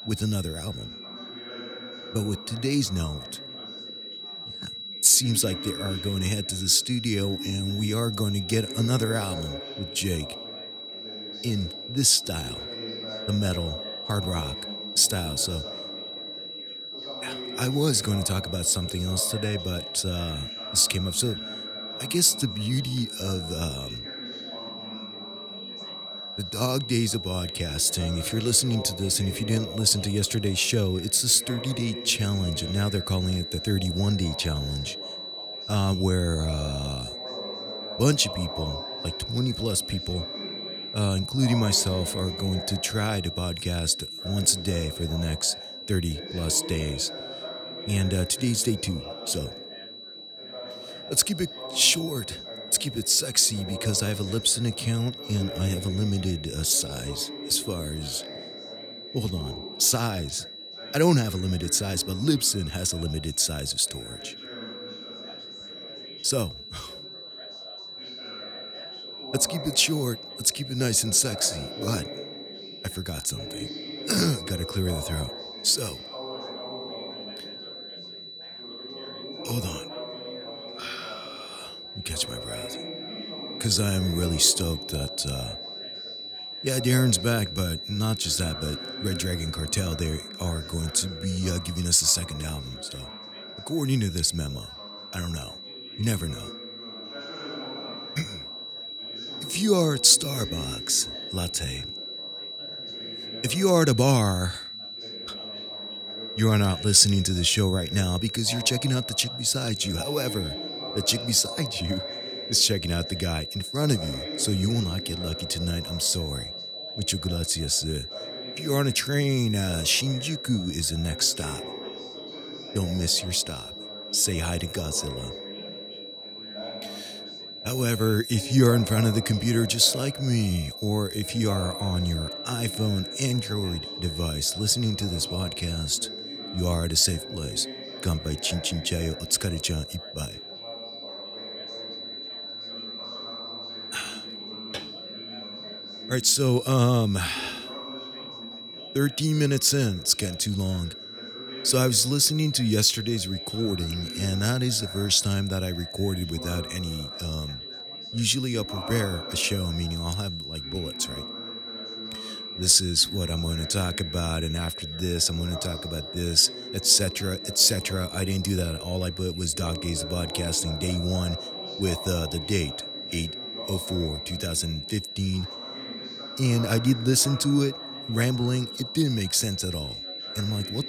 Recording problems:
high-pitched whine; noticeable; throughout; 4 kHz, 10 dB below the speech
background chatter; noticeable; throughout; 4 voices, 15 dB below the speech

